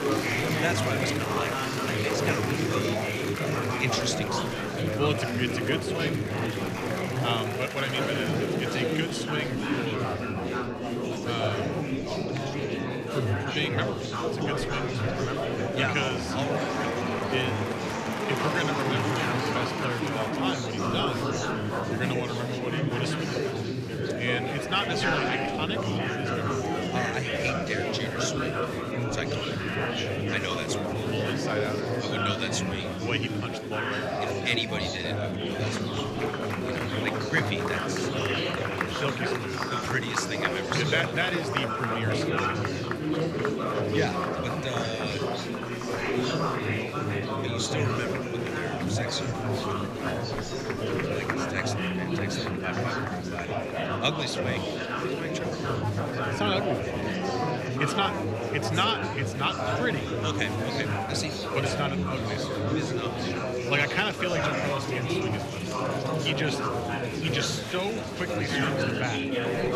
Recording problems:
murmuring crowd; very loud; throughout; 3 dB above the speech

